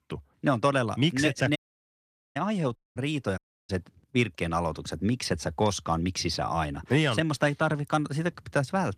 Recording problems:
garbled, watery; slightly; nothing above 14.5 kHz
audio cutting out; at 1.5 s for 1 s, at 3 s and at 3.5 s

